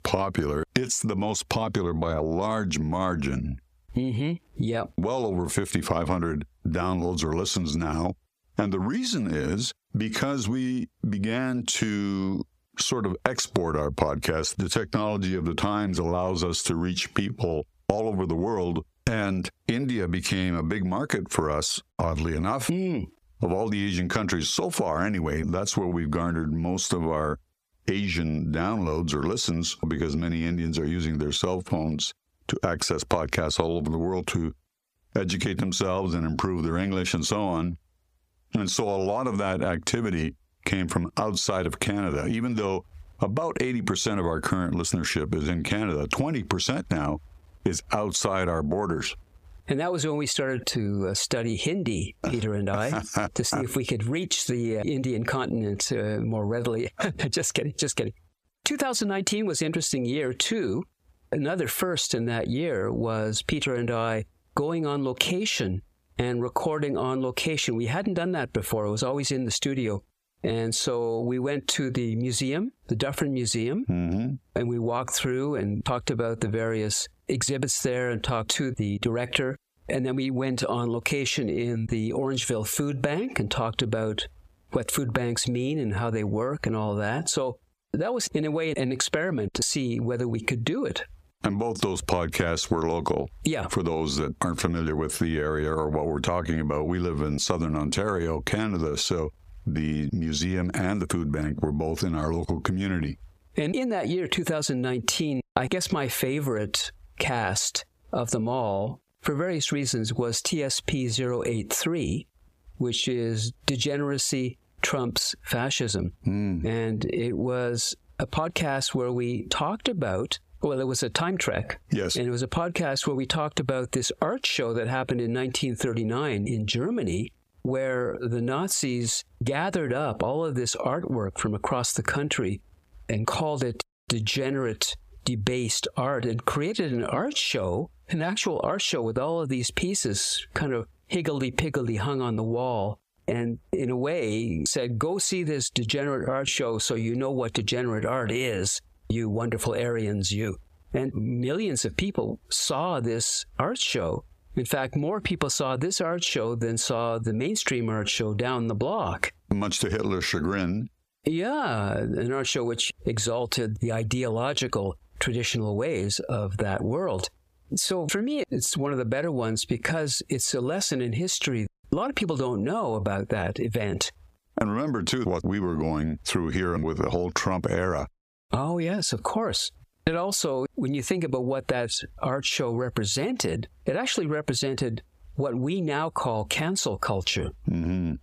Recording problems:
squashed, flat; somewhat

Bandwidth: 15 kHz